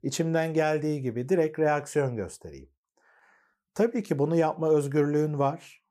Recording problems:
none

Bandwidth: 15 kHz